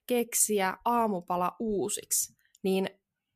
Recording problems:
none

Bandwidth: 14.5 kHz